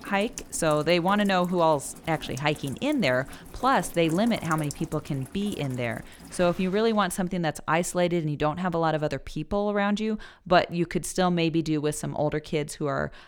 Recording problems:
rain or running water; noticeable; until 6.5 s; 15 dB below the speech

